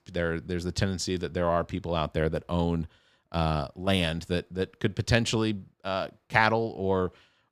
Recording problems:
none

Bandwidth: 15 kHz